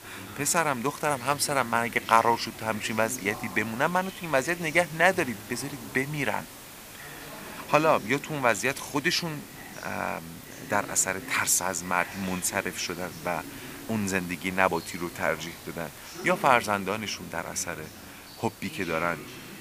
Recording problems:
thin; very slightly; fading below 250 Hz
voice in the background; noticeable; throughout; 15 dB below the speech
hiss; noticeable; throughout; 15 dB below the speech

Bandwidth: 15 kHz